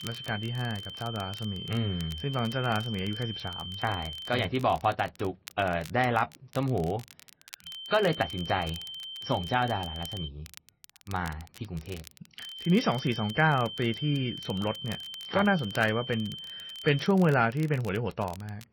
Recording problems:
garbled, watery; slightly
high-pitched whine; loud; until 4.5 s, from 7.5 to 10 s and from 12 to 17 s; 3 kHz, 9 dB below the speech
crackle, like an old record; faint; 20 dB below the speech

